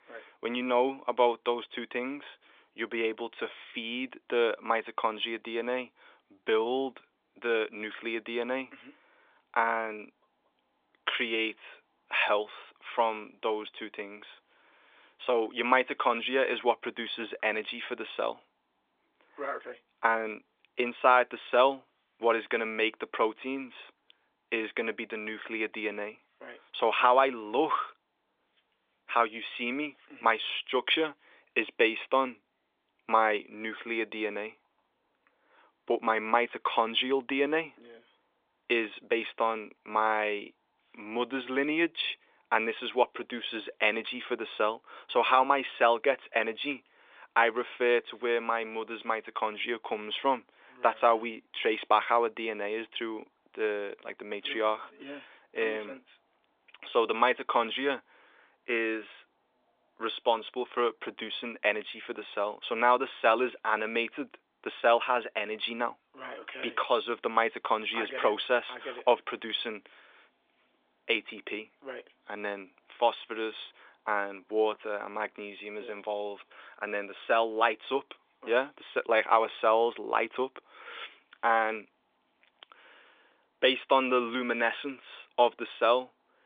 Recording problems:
phone-call audio

